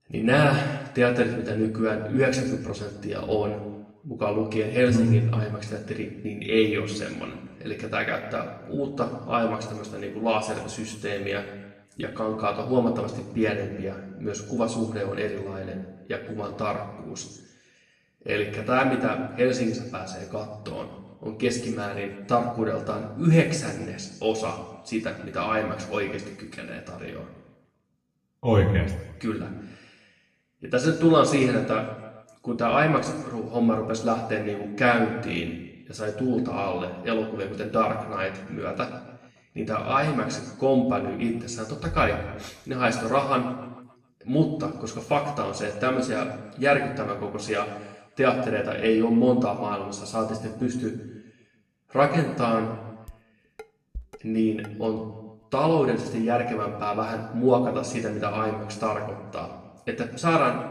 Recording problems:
off-mic speech; far
room echo; noticeable; dies away in 0.9 s
clattering dishes; faint; from 53 to 55 s; peak 15 dB below the speech

